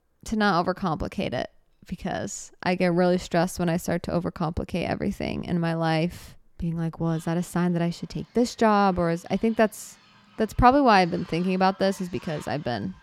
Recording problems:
animal sounds; faint; throughout; 25 dB below the speech

